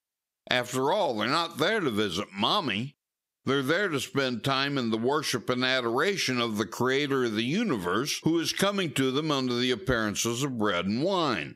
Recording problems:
squashed, flat; somewhat

